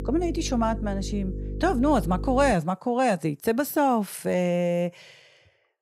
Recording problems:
electrical hum; noticeable; until 2.5 s; 50 Hz, 15 dB below the speech

